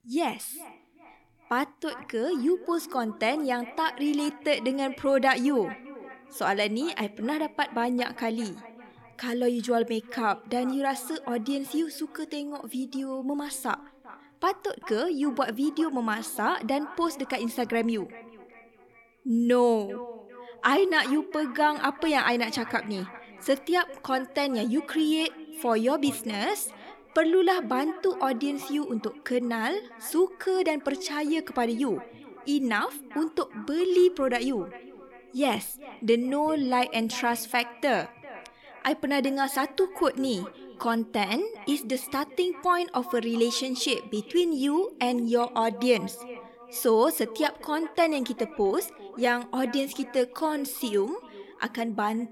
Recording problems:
echo of what is said; faint; throughout; 400 ms later, 20 dB below the speech

